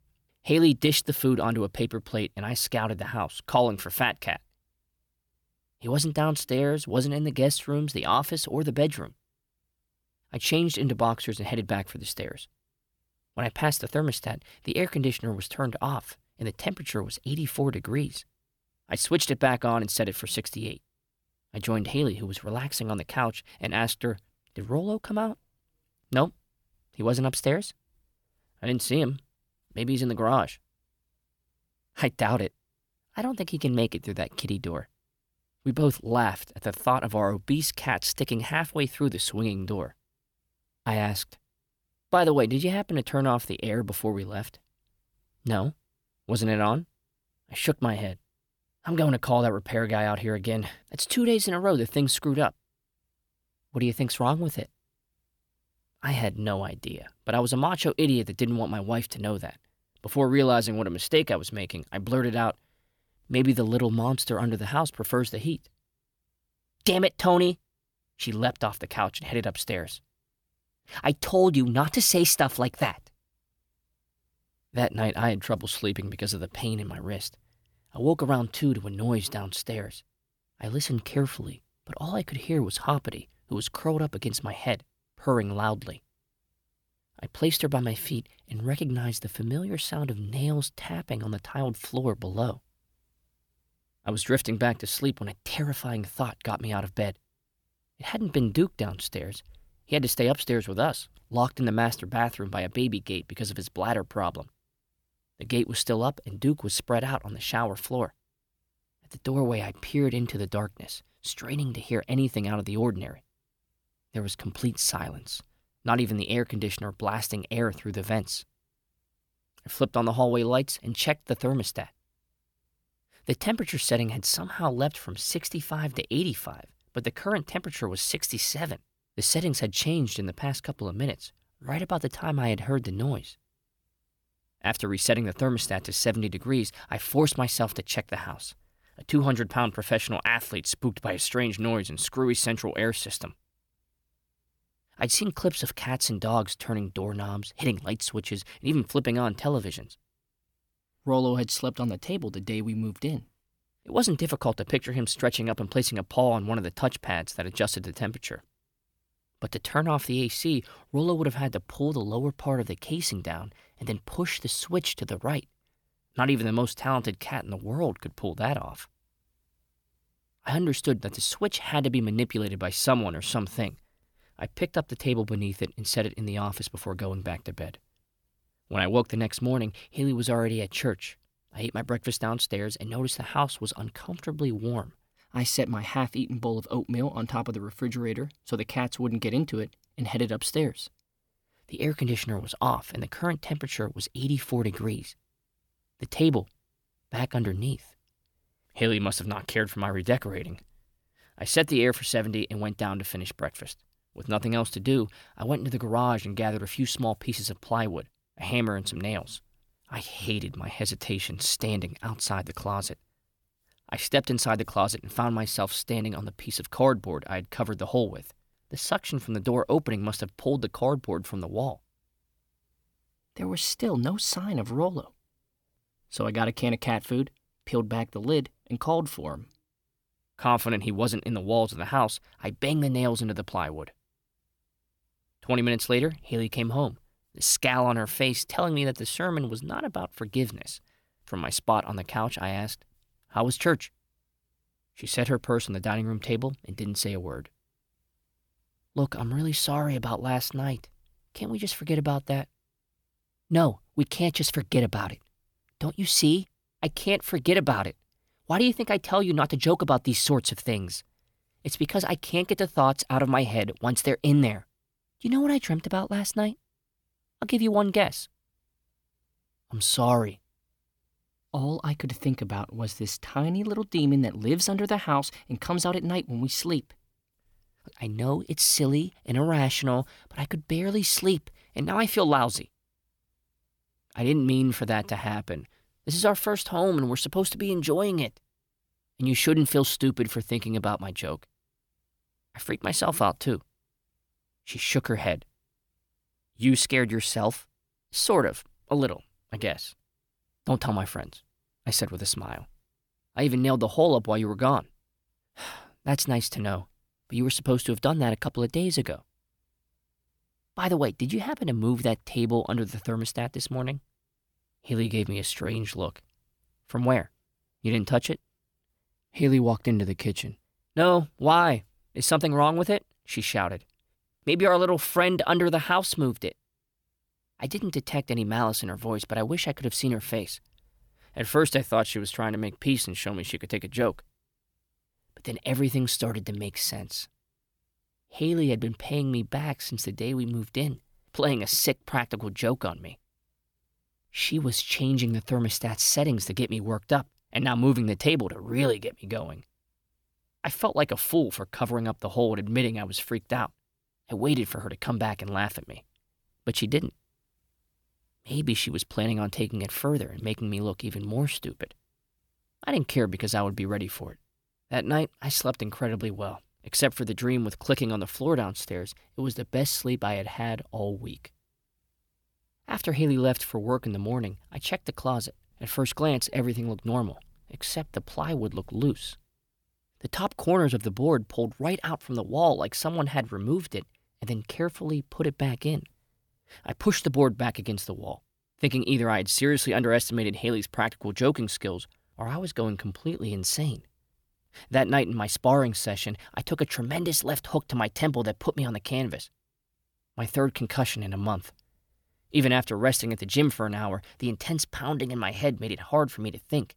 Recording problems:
none

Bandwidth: 18.5 kHz